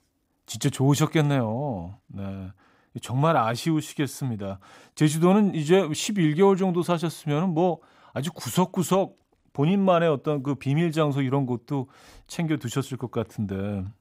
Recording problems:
none

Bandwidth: 15.5 kHz